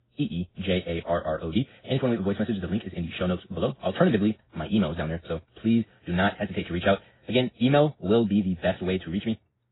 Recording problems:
garbled, watery; badly; nothing above 4 kHz
wrong speed, natural pitch; too fast; 1.7 times normal speed

